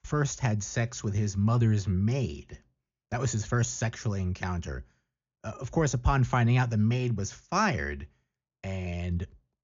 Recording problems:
high frequencies cut off; noticeable; nothing above 7 kHz

